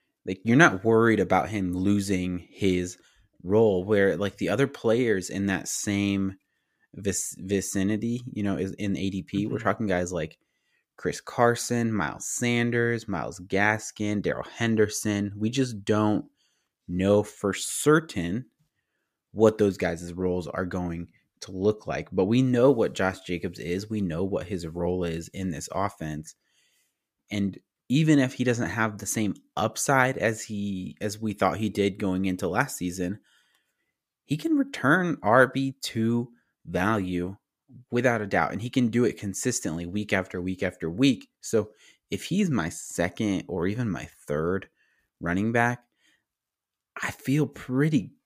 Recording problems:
none

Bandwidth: 15 kHz